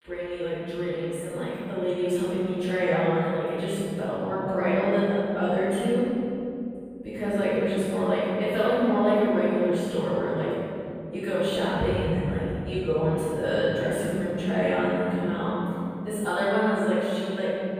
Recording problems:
room echo; strong; dies away in 3 s
off-mic speech; far

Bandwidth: 15 kHz